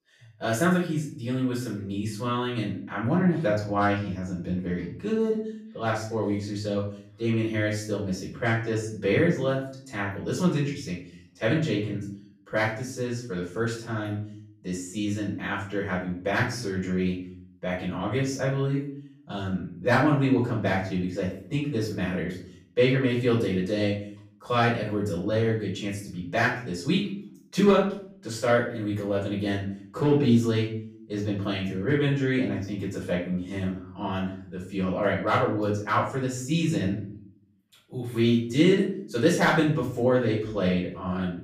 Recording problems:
off-mic speech; far
room echo; noticeable; dies away in 0.5 s

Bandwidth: 15 kHz